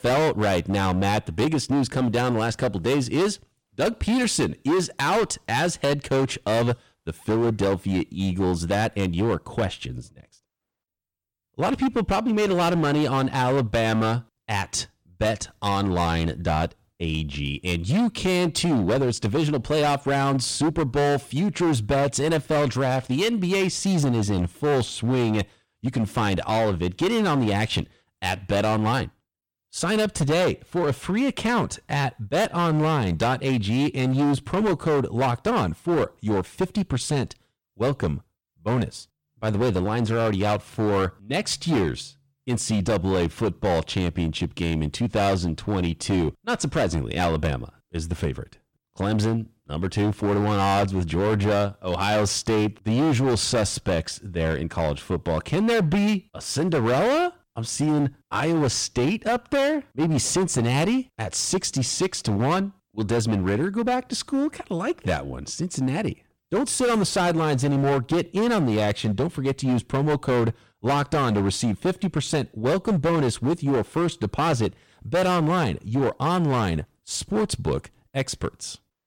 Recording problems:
distortion; heavy; 16% of the sound clipped

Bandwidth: 17.5 kHz